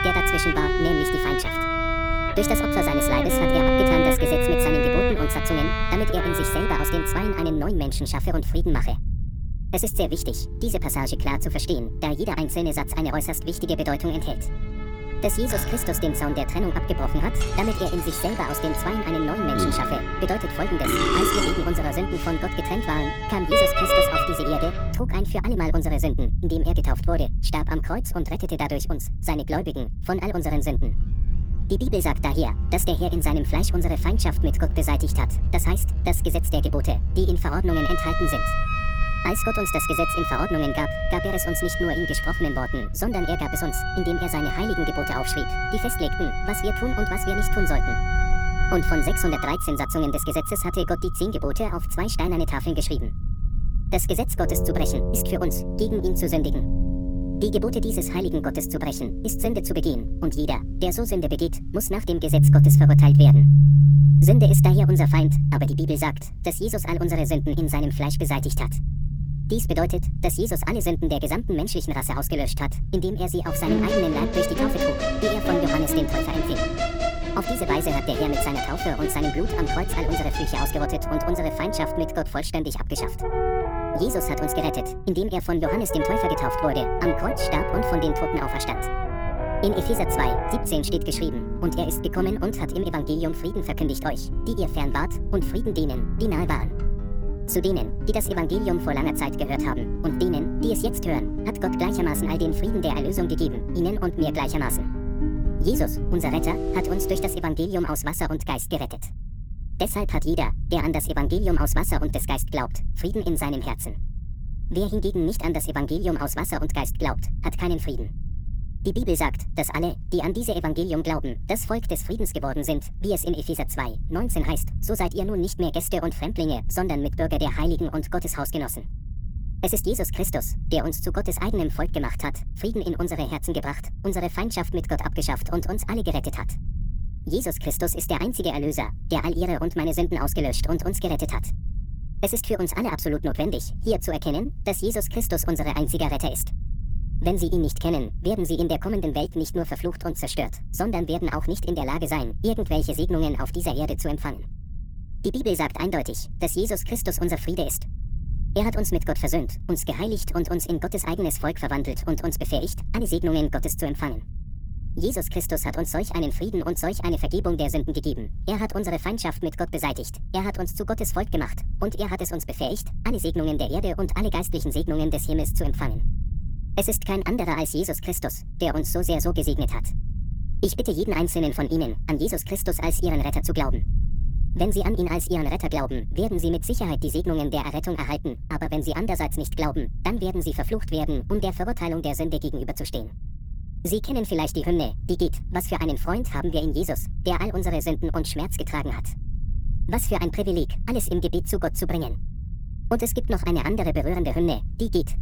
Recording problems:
wrong speed and pitch; too fast and too high; 1.5 times normal speed
background music; very loud; until 1:47; 2 dB above the speech
low rumble; faint; throughout; 20 dB below the speech

